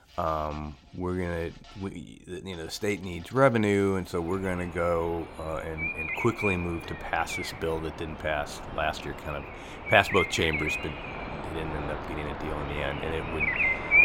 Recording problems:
animal sounds; loud; throughout; 2 dB below the speech

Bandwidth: 16.5 kHz